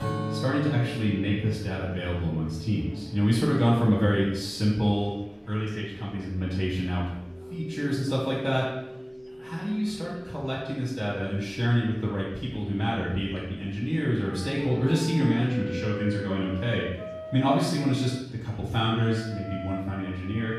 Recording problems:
off-mic speech; far
room echo; noticeable; dies away in 0.7 s
background music; noticeable; throughout; 10 dB below the speech
murmuring crowd; faint; throughout; 30 dB below the speech

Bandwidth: 15.5 kHz